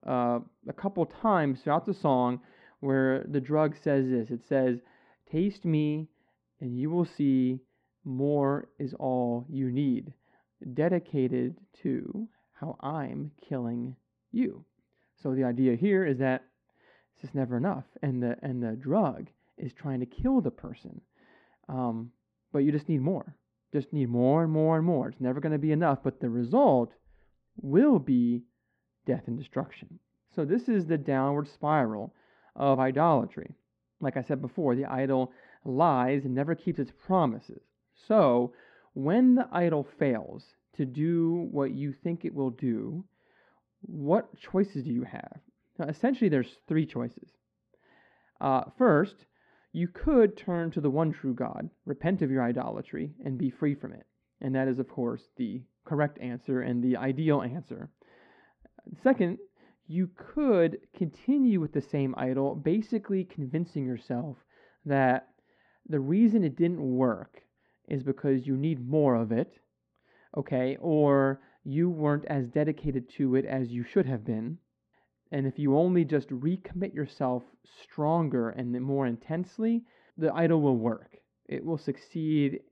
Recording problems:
muffled; very; fading above 1 kHz

